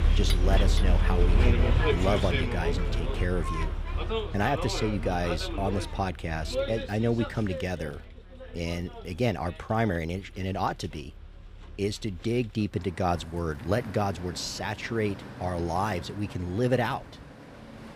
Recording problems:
traffic noise; very loud; throughout; 1 dB above the speech

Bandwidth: 15.5 kHz